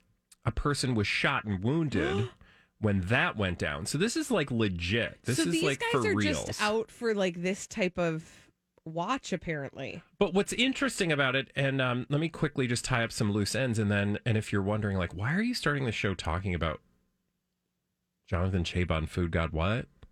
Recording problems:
none

